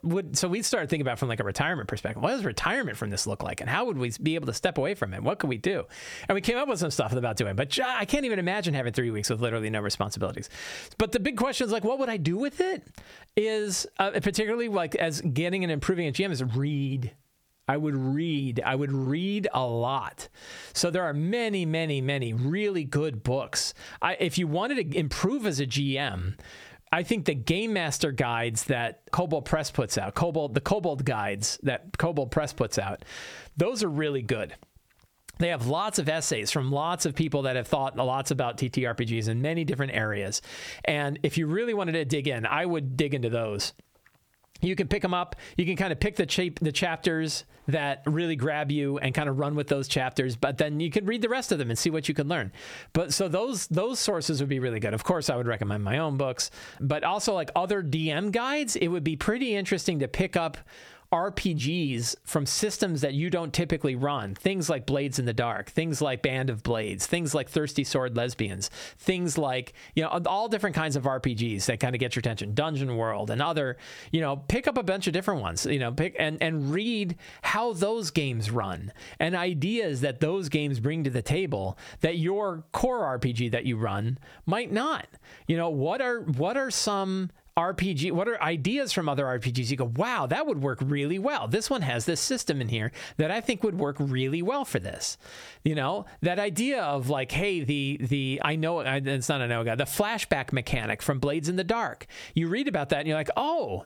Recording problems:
squashed, flat; somewhat

